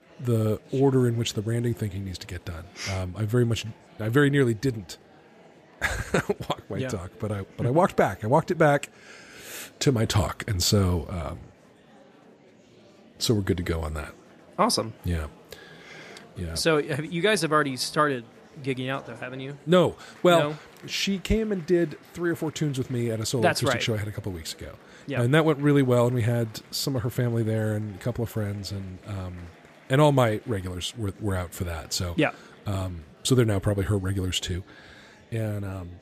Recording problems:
murmuring crowd; faint; throughout; 25 dB below the speech

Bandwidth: 14.5 kHz